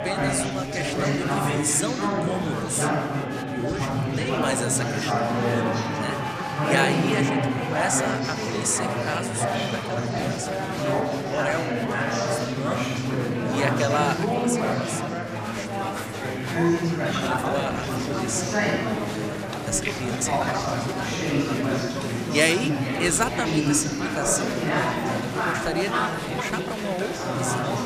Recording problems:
echo of what is said; noticeable; from 15 s on; 460 ms later, 15 dB below the speech
chatter from many people; very loud; throughout; 3 dB above the speech
uneven, jittery; strongly; from 17 to 27 s

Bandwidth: 14.5 kHz